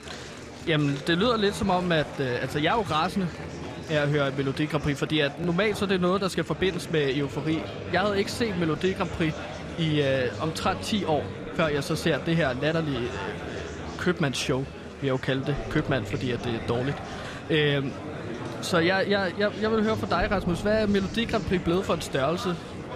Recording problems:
murmuring crowd; loud; throughout; 10 dB below the speech

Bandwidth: 14 kHz